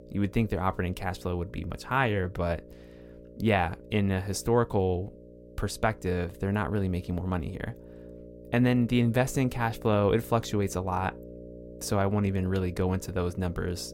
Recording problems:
electrical hum; noticeable; throughout; 60 Hz, 20 dB below the speech

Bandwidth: 16.5 kHz